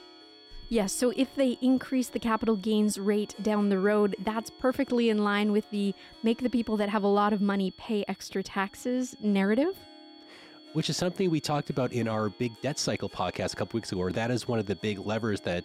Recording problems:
high-pitched whine; faint; throughout; 4.5 kHz, 25 dB below the speech
background music; faint; throughout; 25 dB below the speech

